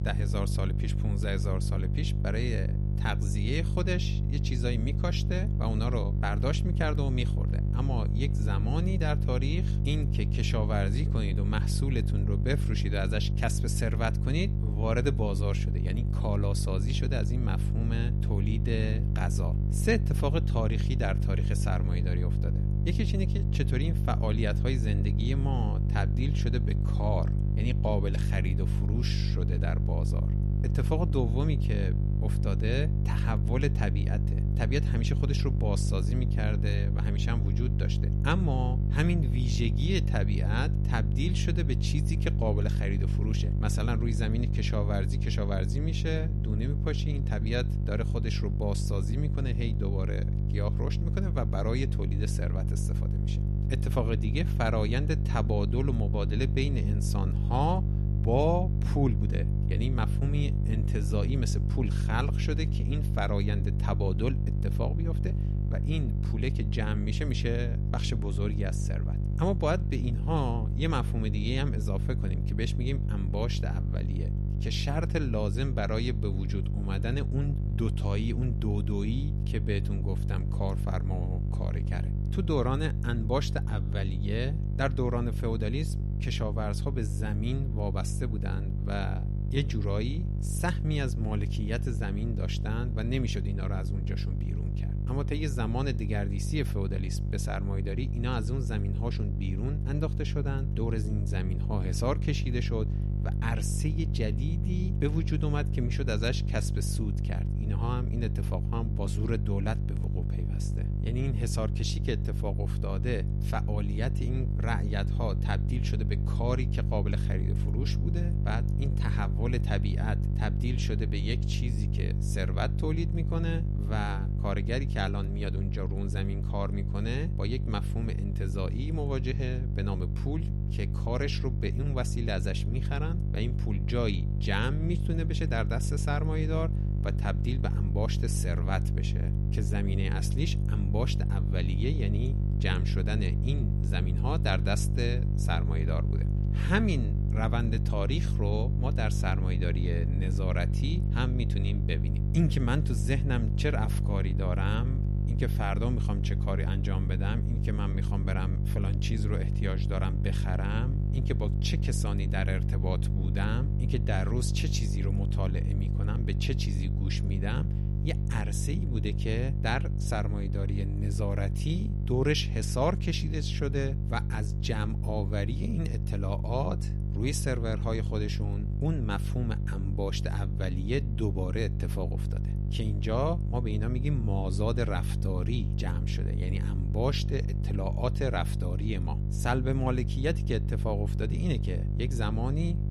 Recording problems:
electrical hum; loud; throughout; 50 Hz, 6 dB below the speech

